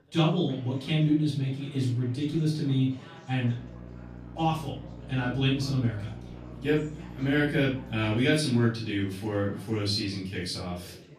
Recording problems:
off-mic speech; far
room echo; slight; dies away in 0.4 s
electrical hum; faint; from 3.5 to 8 s; 60 Hz, 20 dB below the speech
chatter from many people; faint; throughout; 20 dB below the speech

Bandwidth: 15 kHz